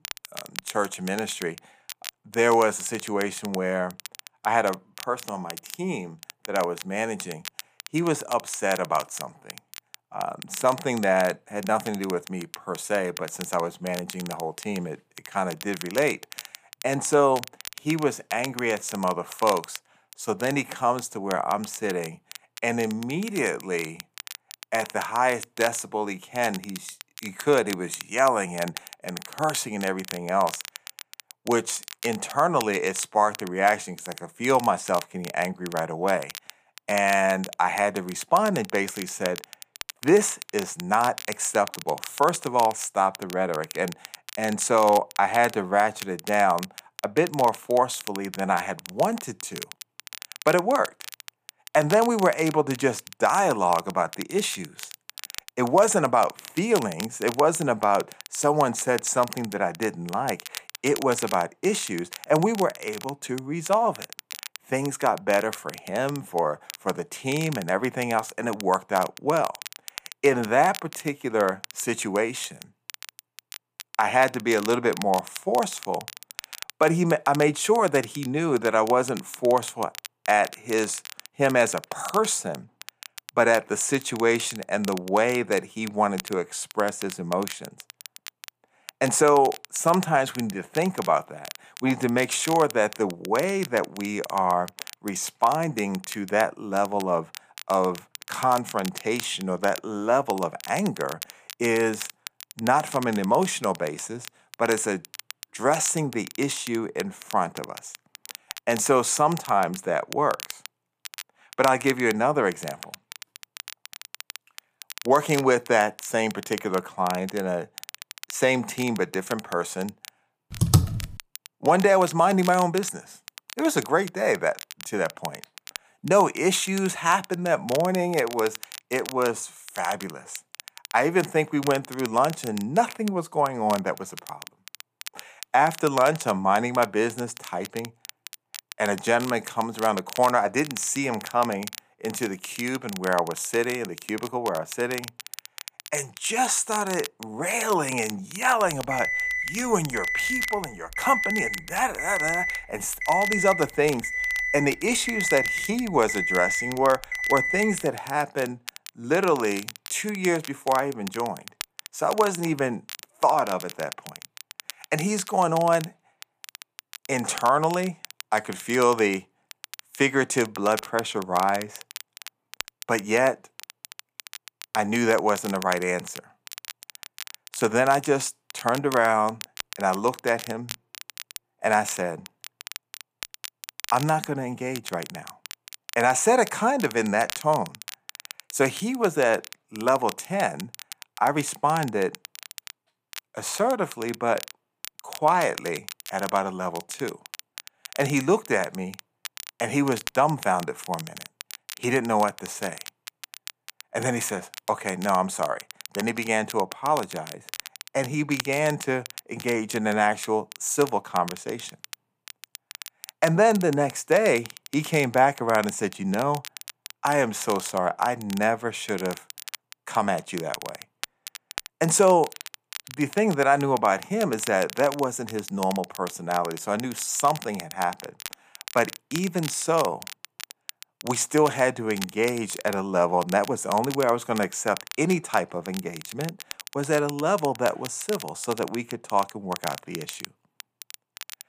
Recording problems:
crackle, like an old record; noticeable; 15 dB below the speech
keyboard typing; loud; at 2:01; peak 4 dB above the speech
alarm; loud; from 2:29 to 2:38; peak 1 dB above the speech

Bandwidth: 15 kHz